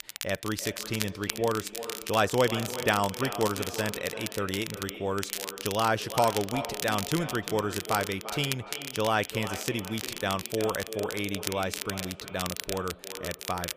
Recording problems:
echo of what is said; strong; throughout; 350 ms later, 10 dB below the speech
crackle, like an old record; loud; 6 dB below the speech

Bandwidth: 15 kHz